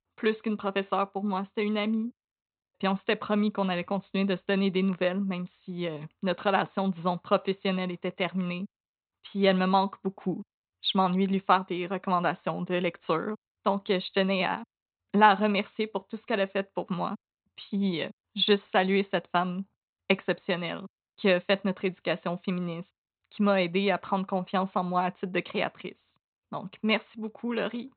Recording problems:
high frequencies cut off; severe; nothing above 4 kHz

